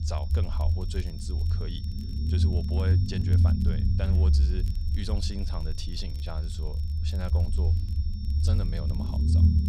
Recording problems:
low rumble; loud; throughout; 1 dB below the speech
high-pitched whine; noticeable; throughout; 5.5 kHz, 10 dB below the speech
crackle, like an old record; faint; 20 dB below the speech

